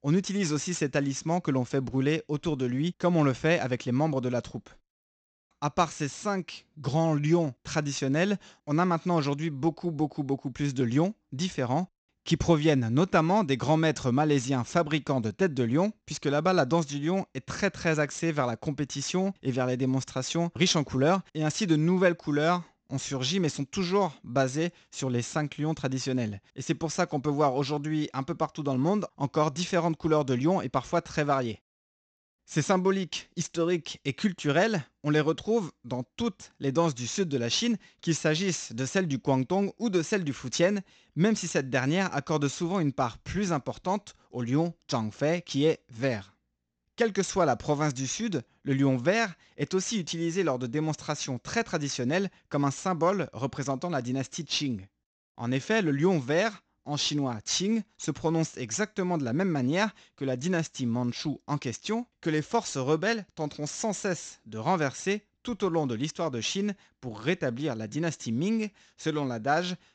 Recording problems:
high frequencies cut off; noticeable; nothing above 8 kHz

